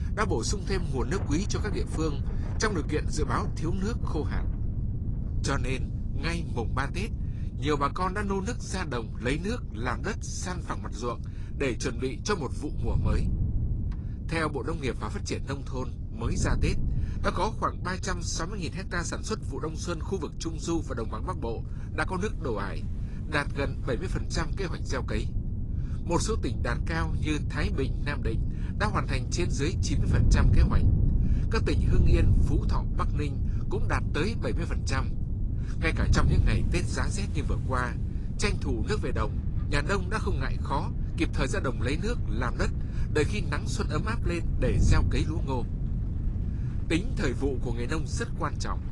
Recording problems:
garbled, watery; slightly
wind noise on the microphone; occasional gusts; 10 dB below the speech
rain or running water; faint; throughout; 25 dB below the speech

